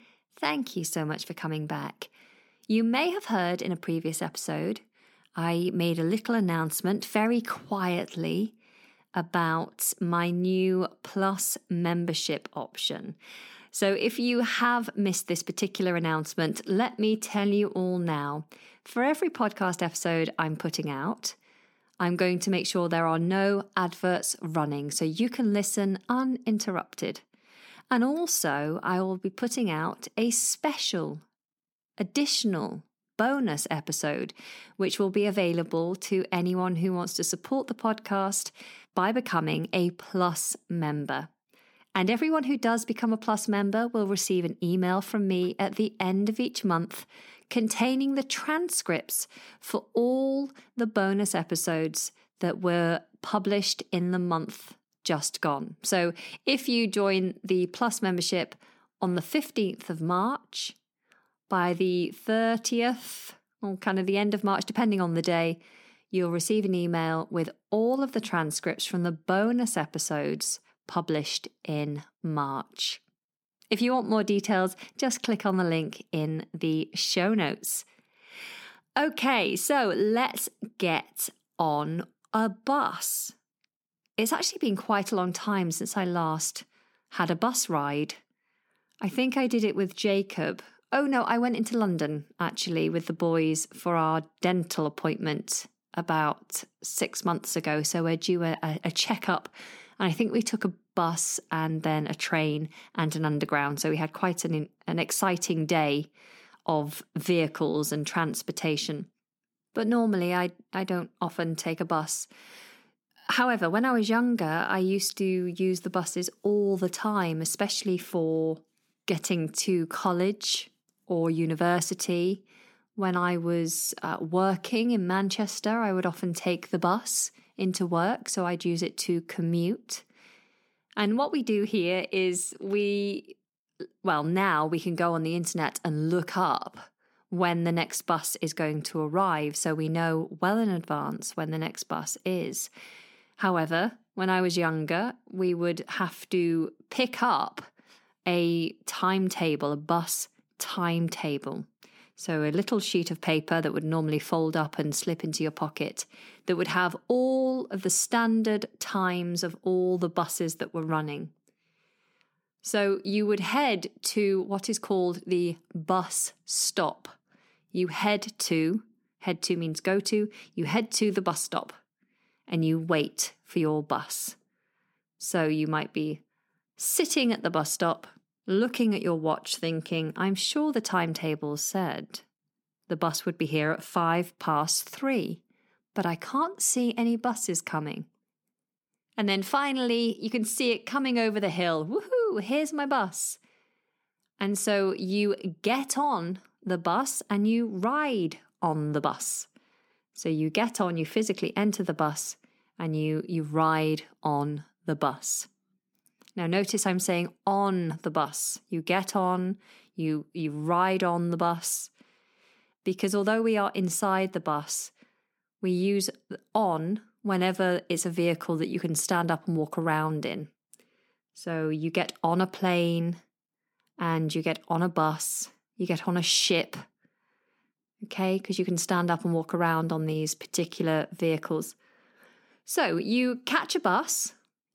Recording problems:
none

